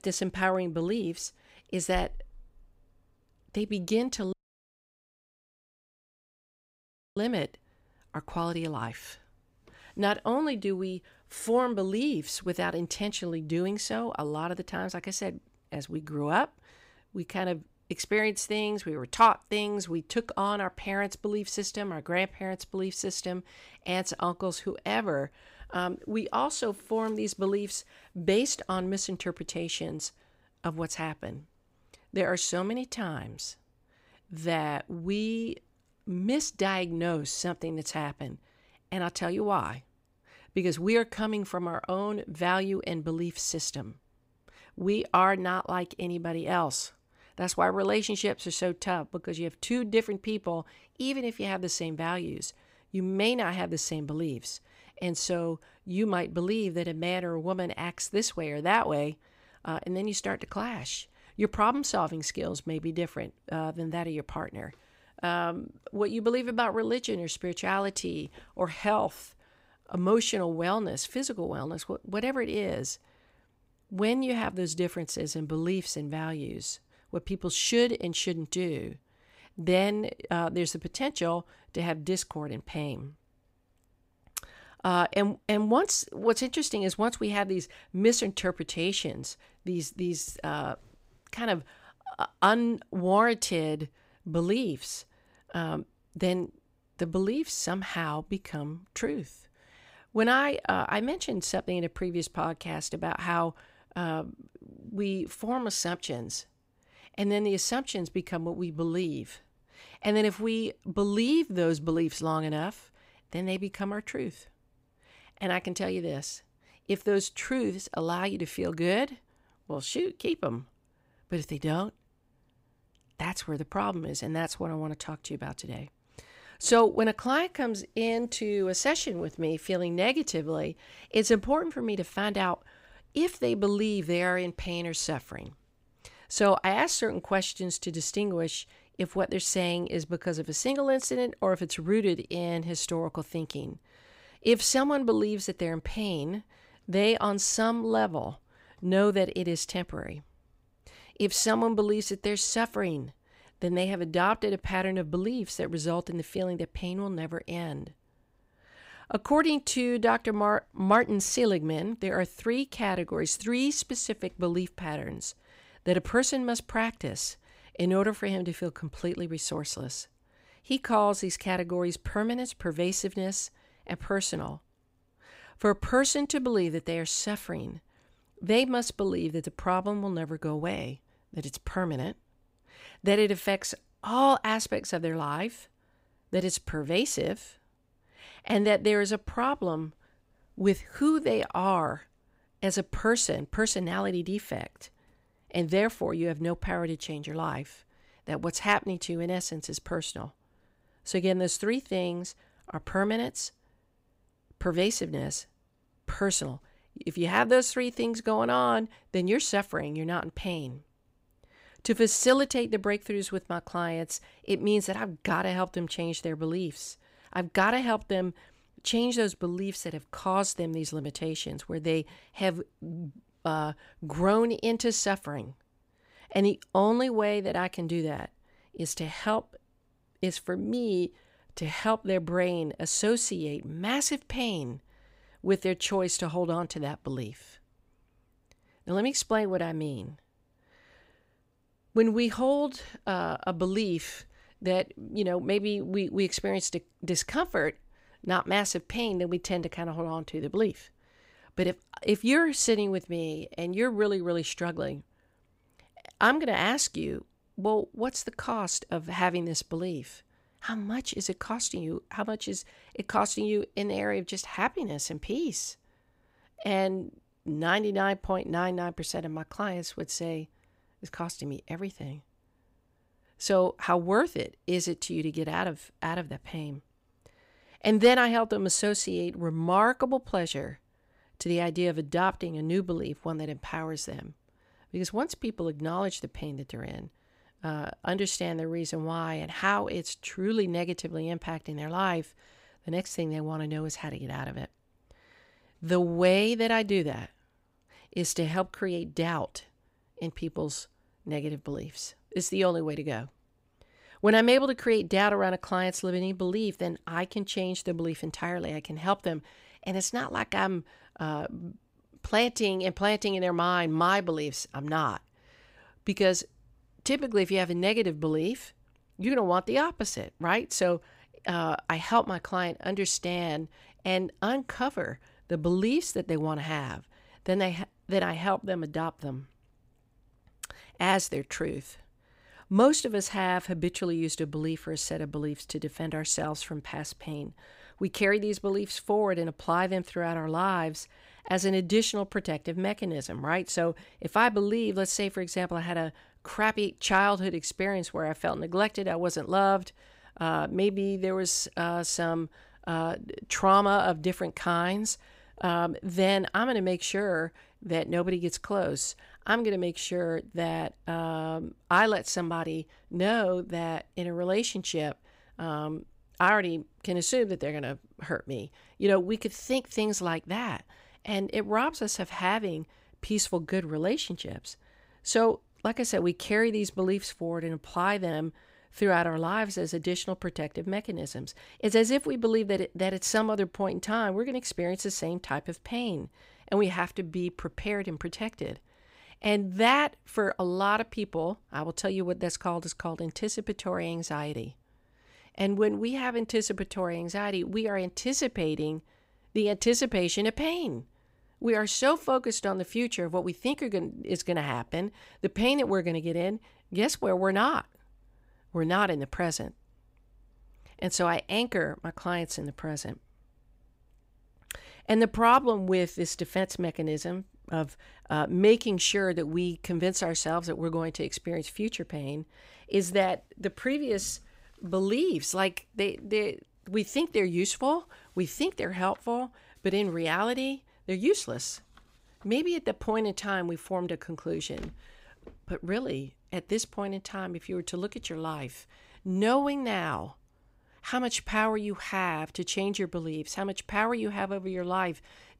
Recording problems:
audio cutting out; at 4.5 s for 3 s

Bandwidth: 15.5 kHz